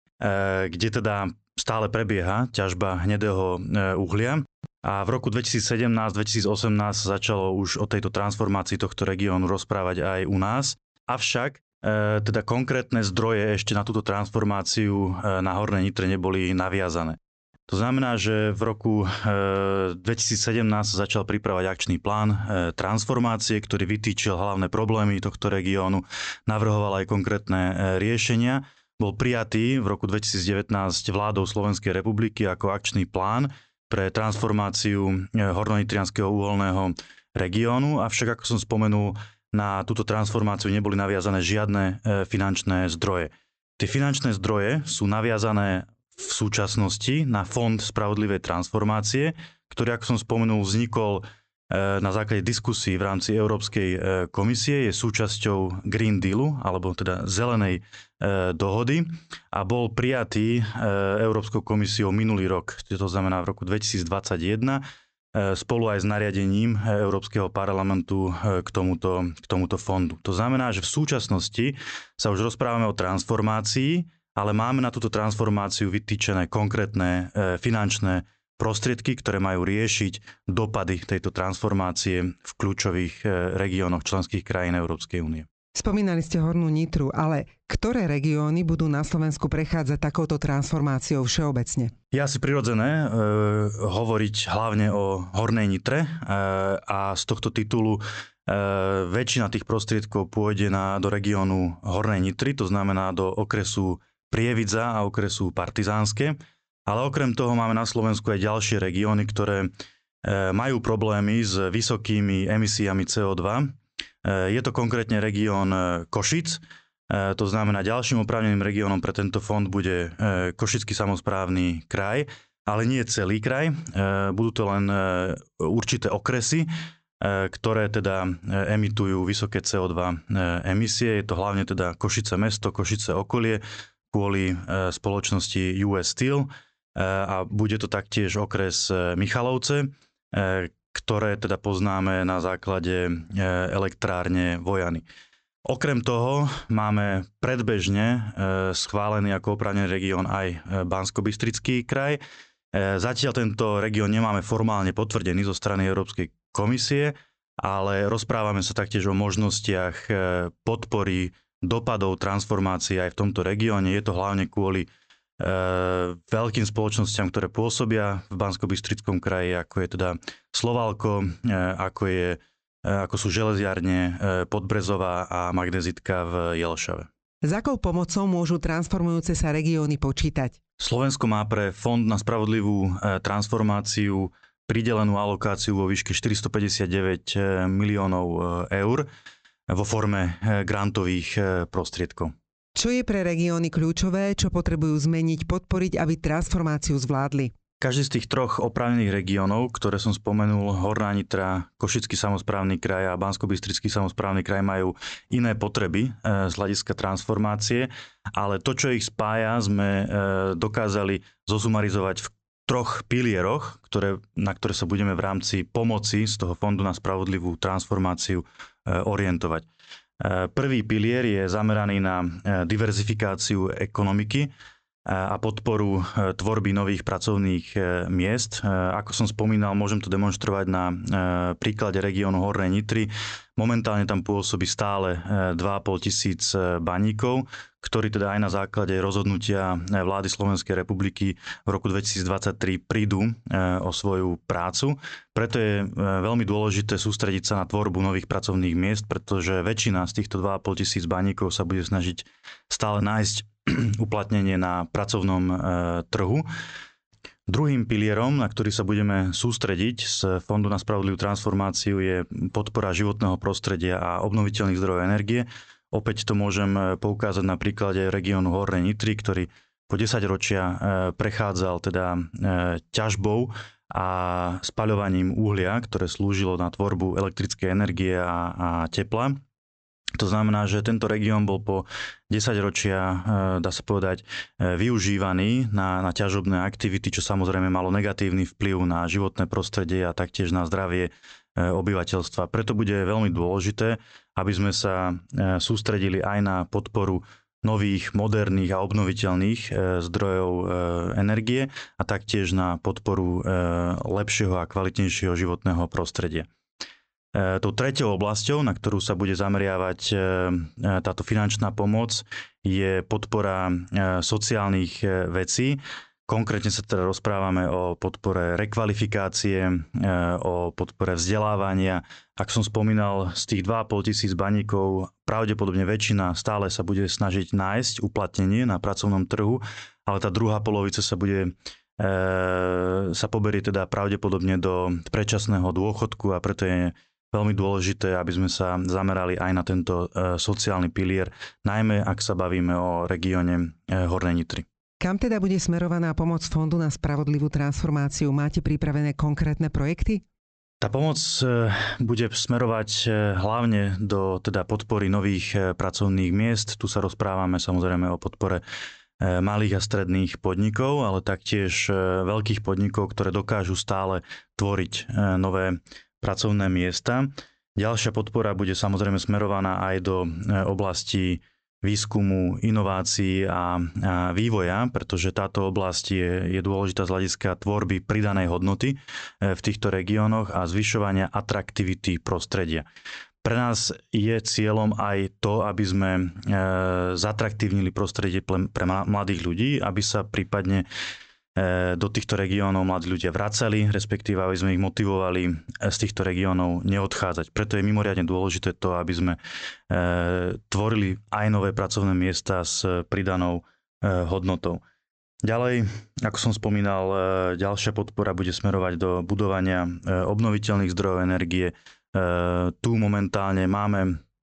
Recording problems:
high frequencies cut off; noticeable; nothing above 8 kHz
squashed, flat; somewhat

